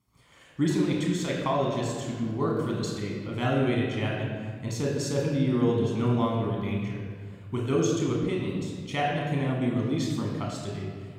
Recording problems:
room echo; noticeable; dies away in 1.9 s
off-mic speech; somewhat distant

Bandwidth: 17 kHz